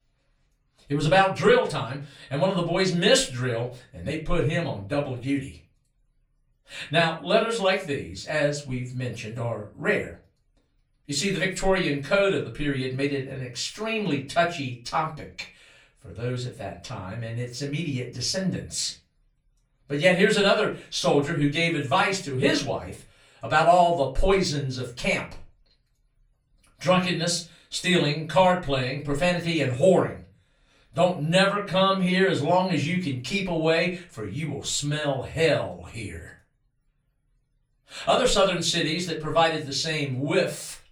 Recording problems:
off-mic speech; far
room echo; very slight; dies away in 0.3 s

